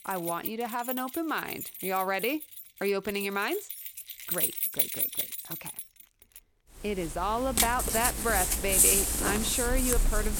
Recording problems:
household noises; very loud; throughout; 4 dB above the speech

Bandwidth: 17.5 kHz